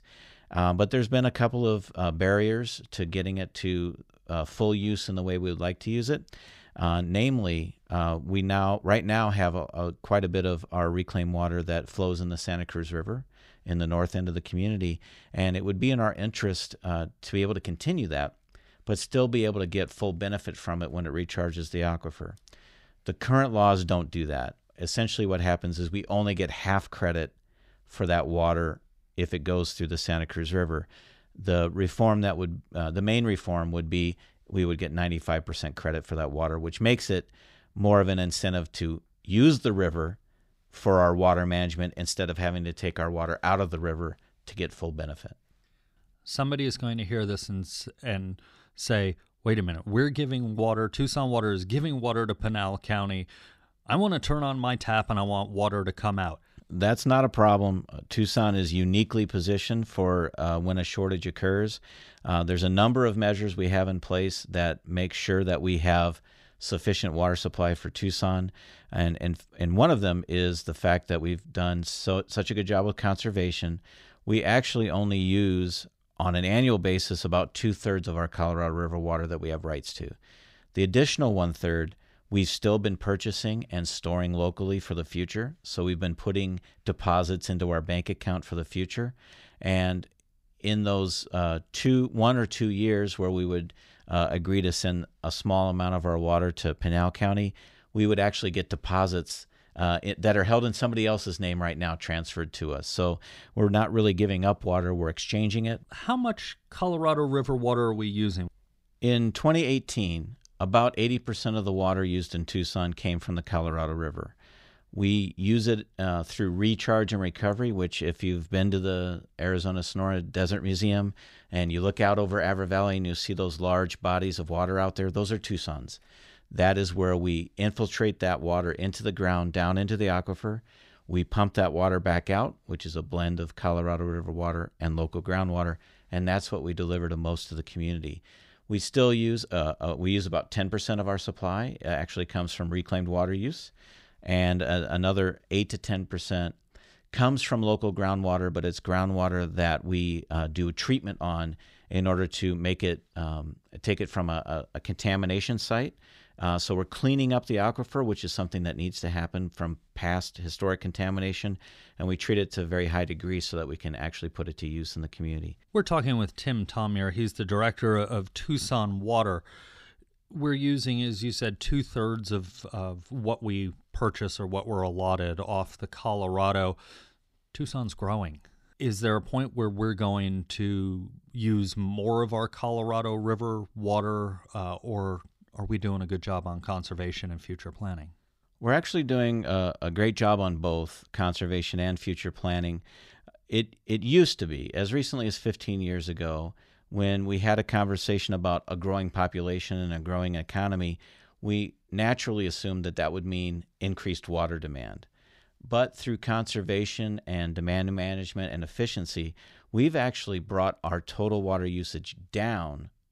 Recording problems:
none

